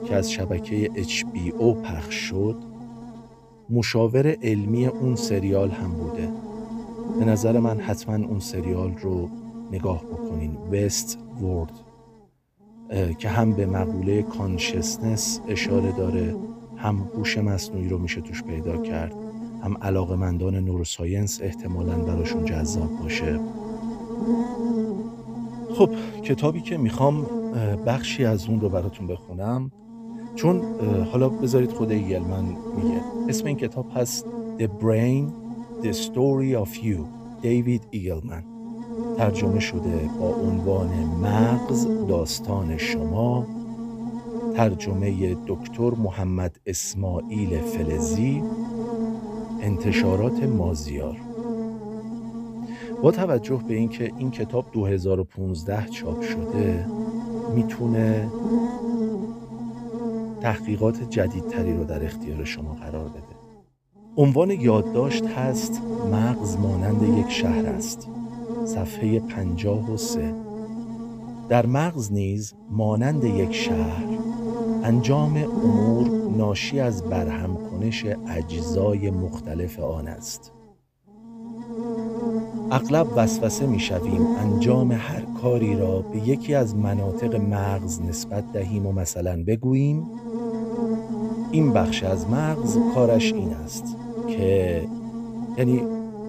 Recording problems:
electrical hum; loud; throughout; 50 Hz, 5 dB below the speech

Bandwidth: 15 kHz